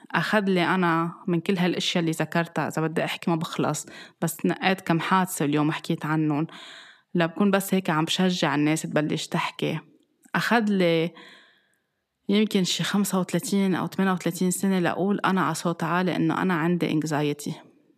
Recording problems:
none

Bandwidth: 14.5 kHz